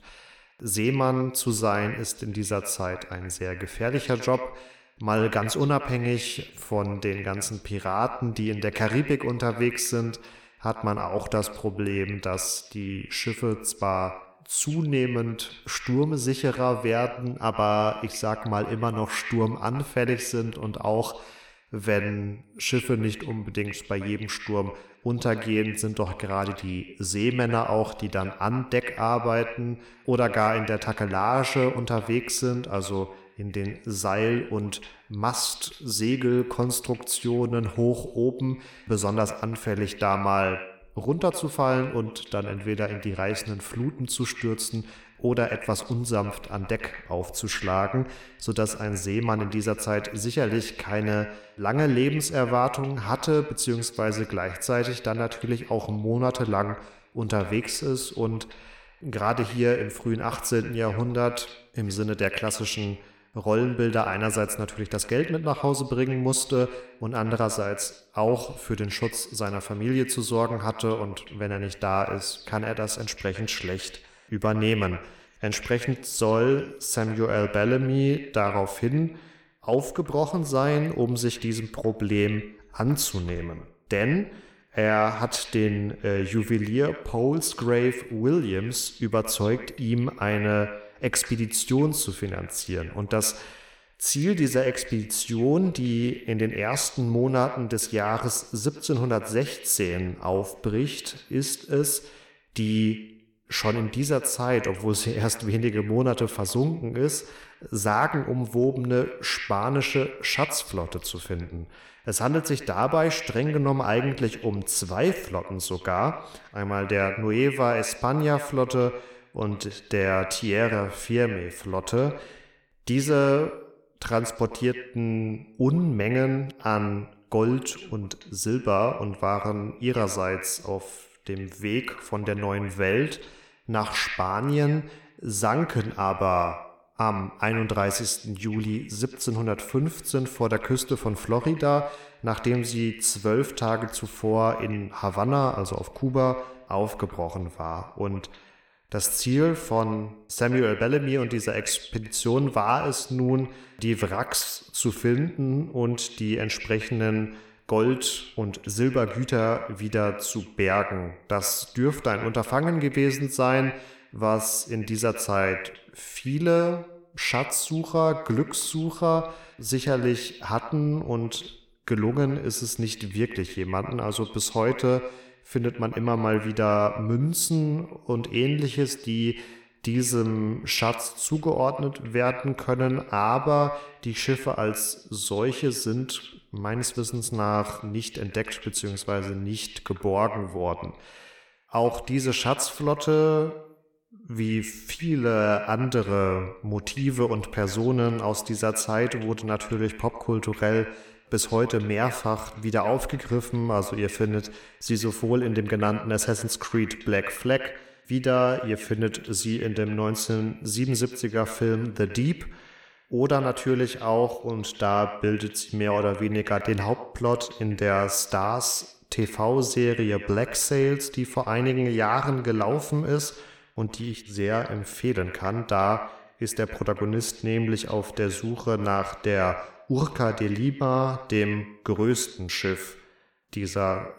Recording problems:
echo of what is said; noticeable; throughout; 100 ms later, 15 dB below the speech

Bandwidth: 17 kHz